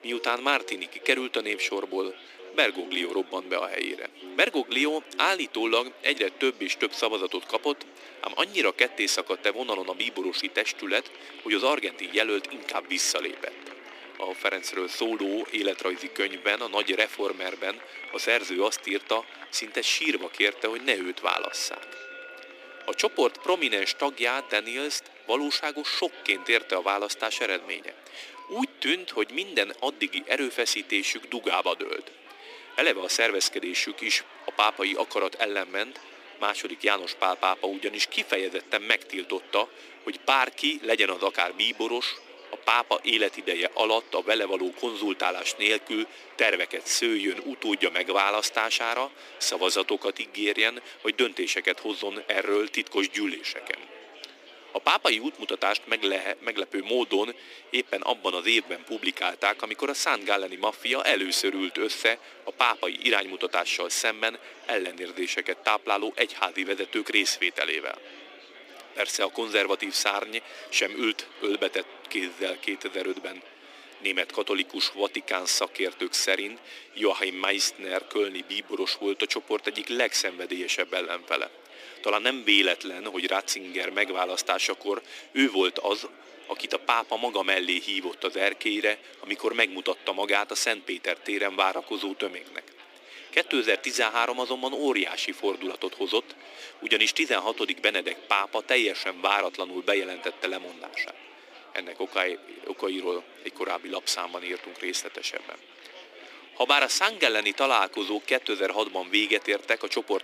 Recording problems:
thin; somewhat; fading below 300 Hz
murmuring crowd; noticeable; throughout; 20 dB below the speech
background music; faint; until 28 s; 20 dB below the speech

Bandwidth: 15 kHz